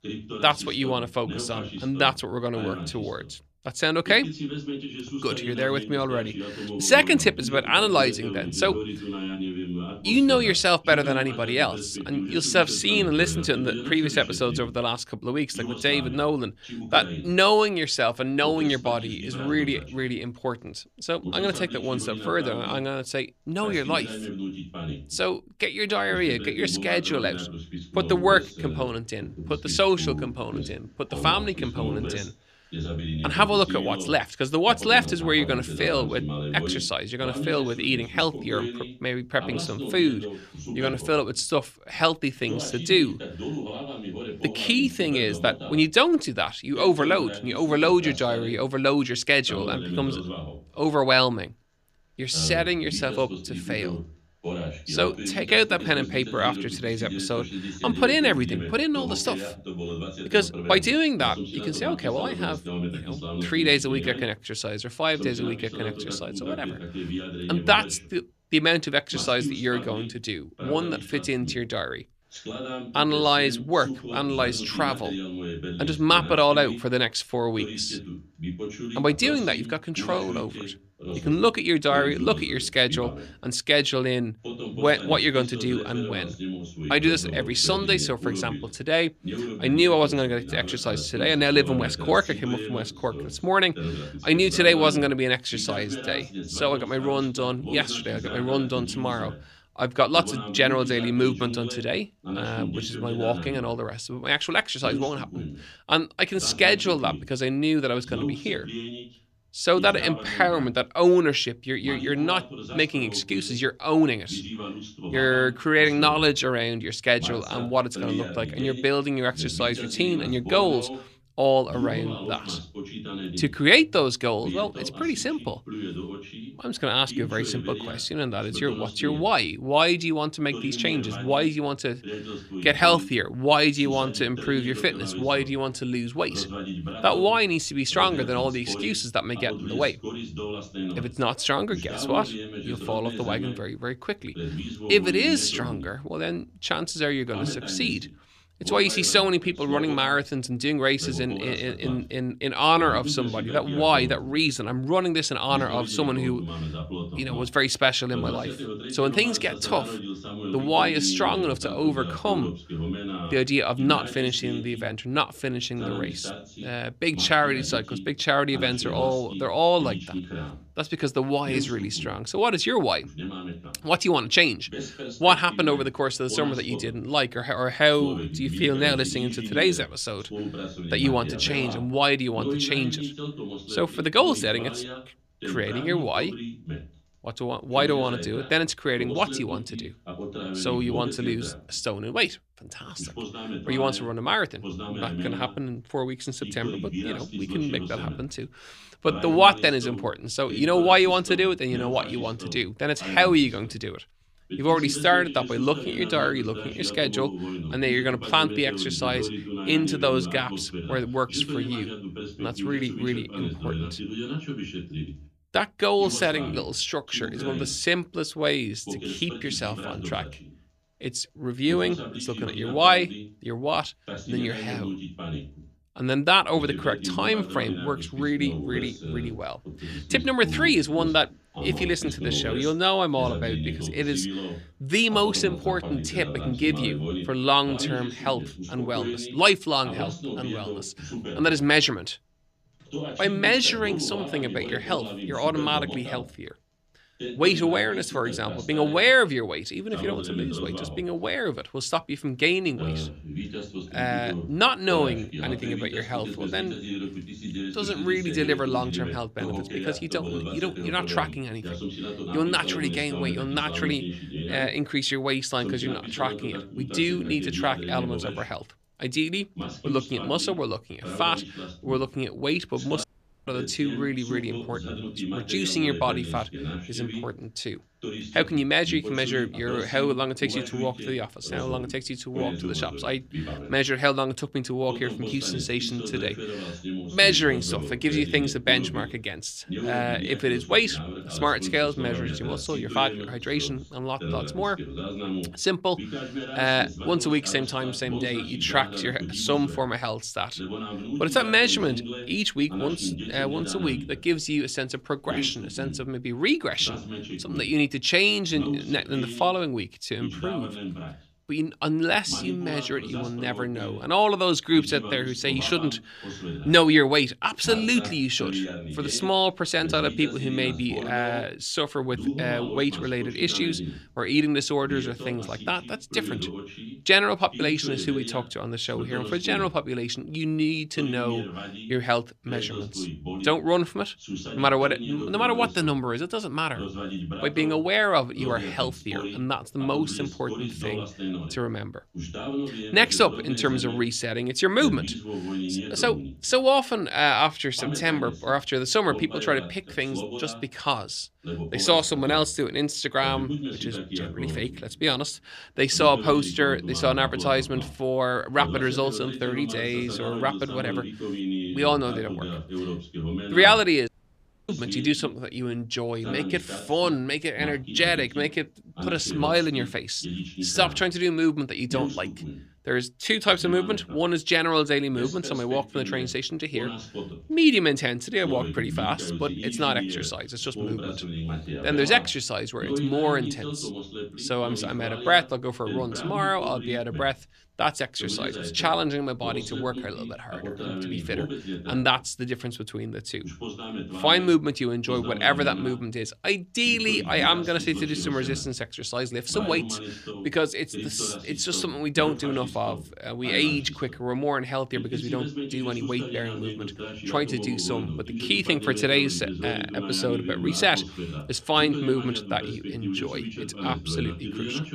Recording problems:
voice in the background; loud; throughout; 10 dB below the speech
audio cutting out; at 4:33 and at 6:04 for 0.5 s

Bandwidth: 14.5 kHz